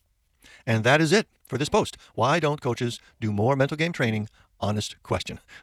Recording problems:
wrong speed, natural pitch; too fast; 1.5 times normal speed

